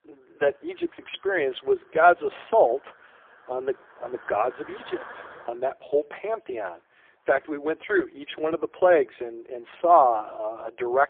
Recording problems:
phone-call audio; poor line; nothing above 3.5 kHz
traffic noise; faint; throughout; 25 dB below the speech

